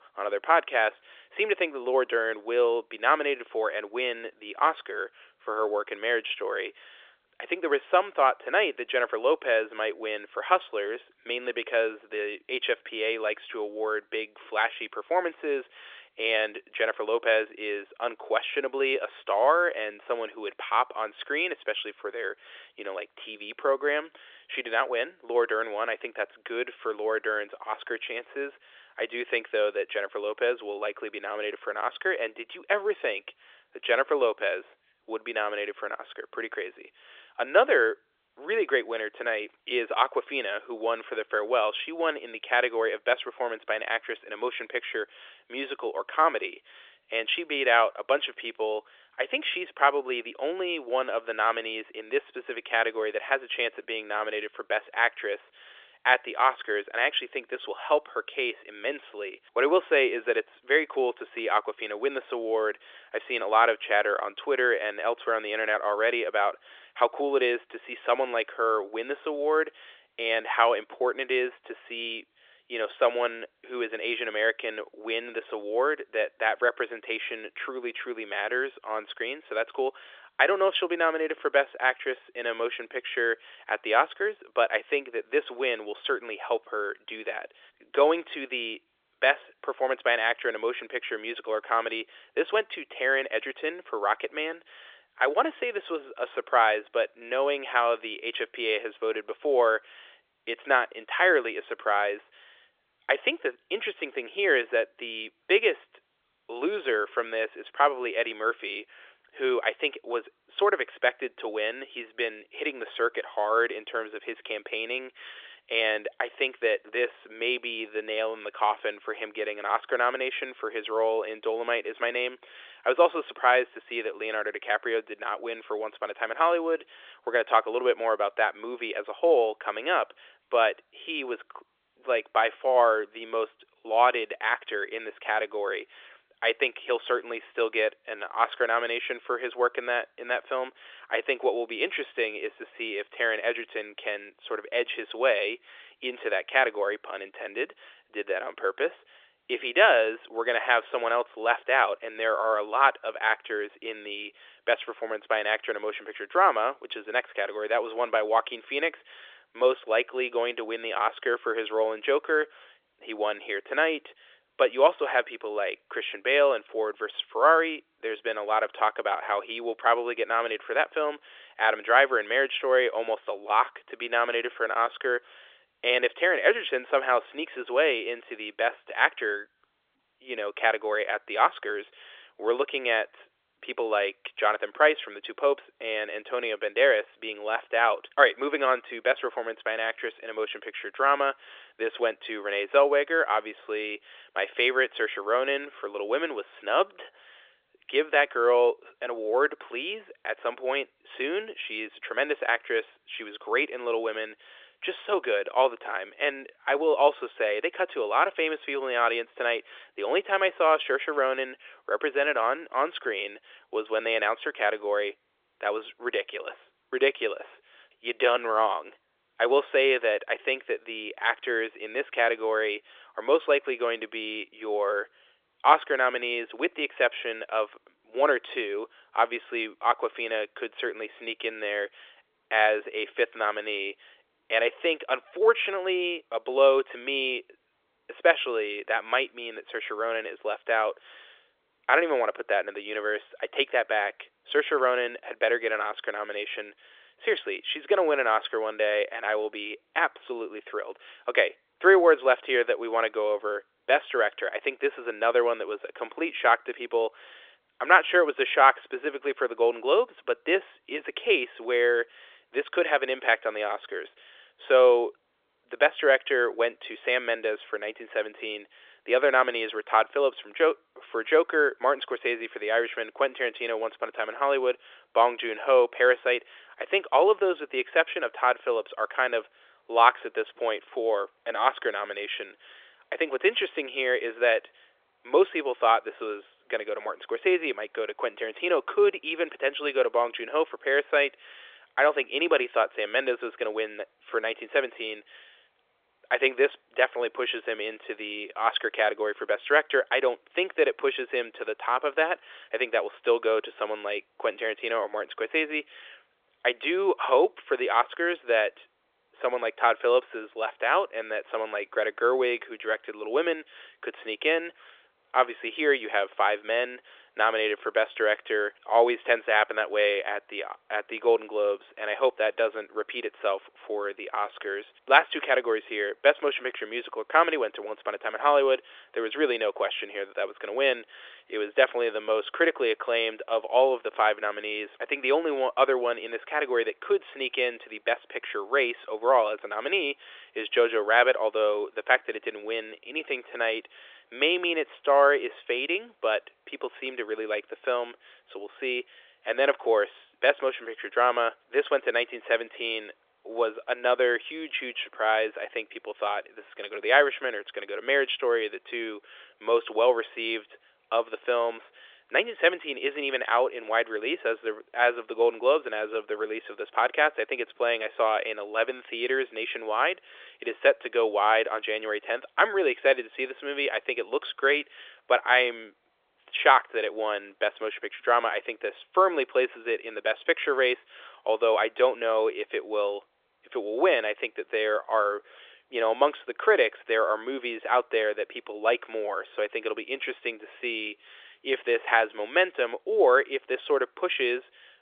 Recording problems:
phone-call audio; nothing above 3.5 kHz

